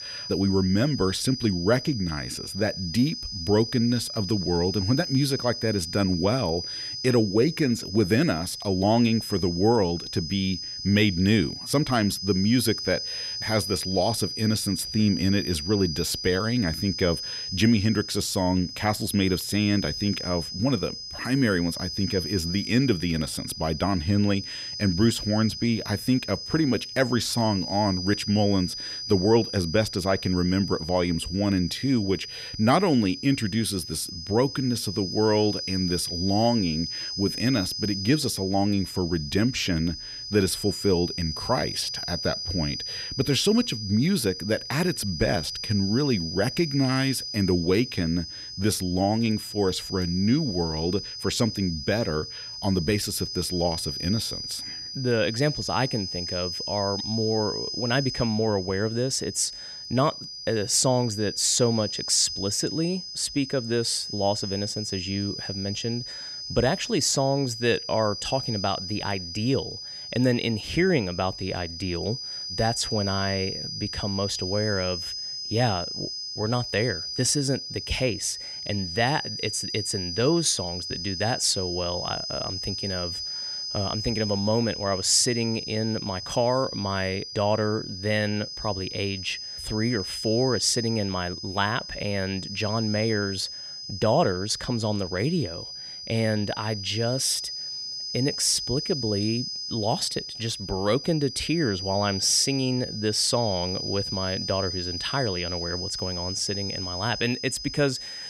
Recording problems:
high-pitched whine; loud; throughout; 5 kHz, 6 dB below the speech

